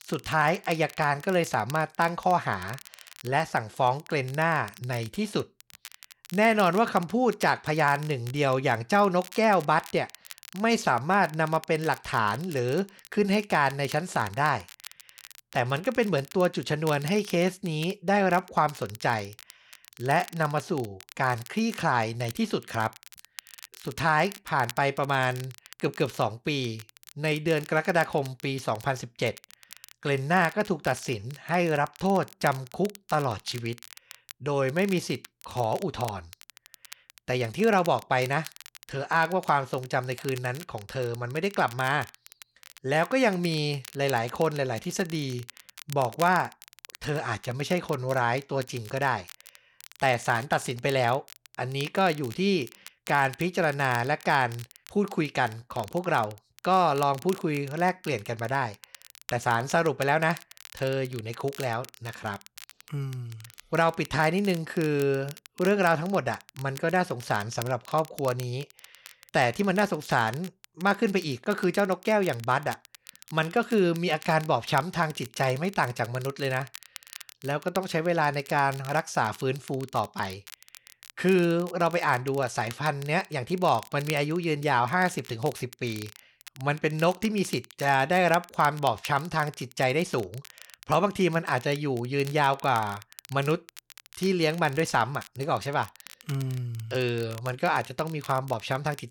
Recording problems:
crackle, like an old record; noticeable; 20 dB below the speech

